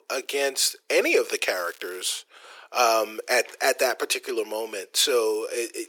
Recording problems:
thin; very; fading below 350 Hz
crackling; faint; at 1.5 s; 25 dB below the speech

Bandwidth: 17.5 kHz